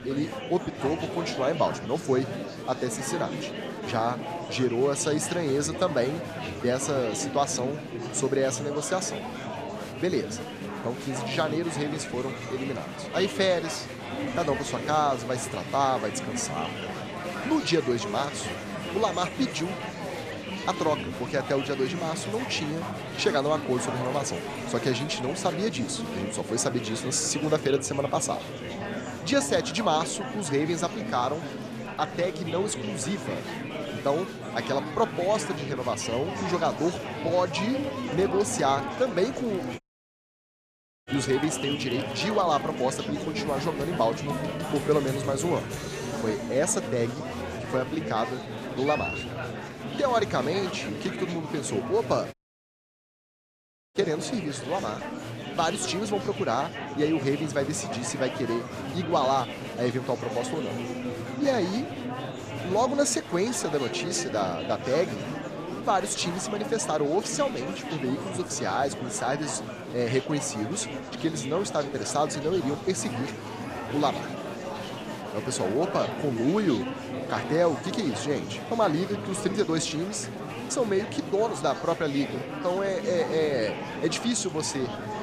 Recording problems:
murmuring crowd; loud; throughout; 6 dB below the speech
audio cutting out; at 40 s for 1.5 s and at 52 s for 1.5 s

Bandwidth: 14.5 kHz